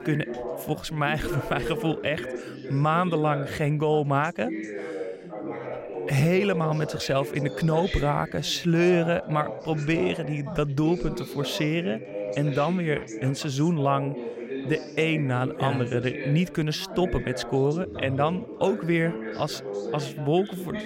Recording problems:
background chatter; loud; throughout; 3 voices, 9 dB below the speech

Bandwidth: 16 kHz